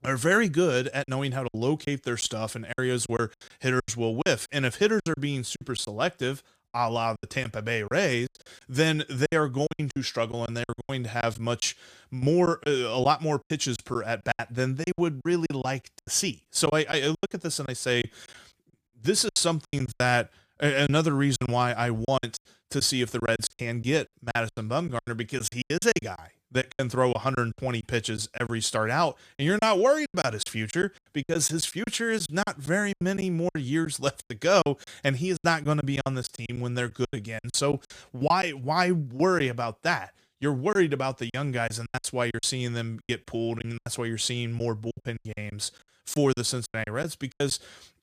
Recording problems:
choppy; very; 13% of the speech affected

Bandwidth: 15 kHz